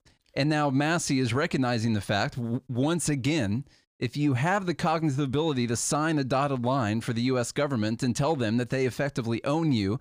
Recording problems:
none

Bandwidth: 15 kHz